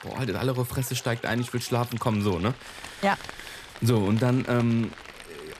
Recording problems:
rain or running water; noticeable; throughout; 15 dB below the speech

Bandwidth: 14.5 kHz